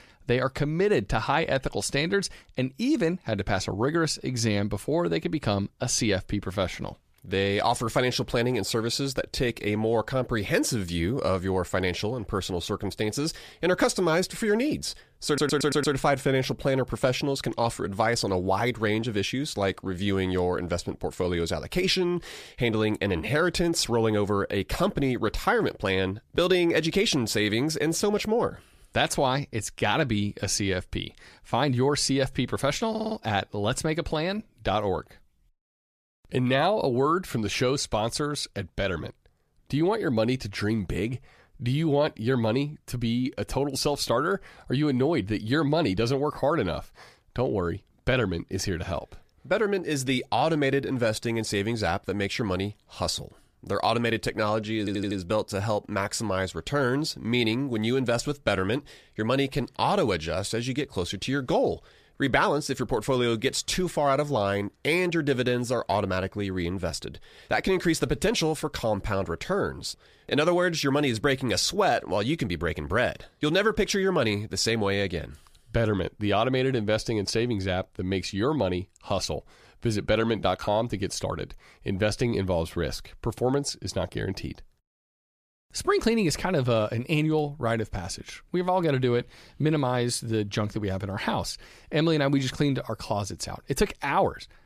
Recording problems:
audio stuttering; at 15 s, at 33 s and at 55 s

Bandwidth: 14.5 kHz